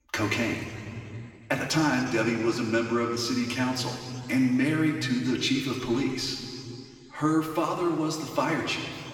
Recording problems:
off-mic speech; far
room echo; noticeable; dies away in 2.5 s

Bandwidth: 17.5 kHz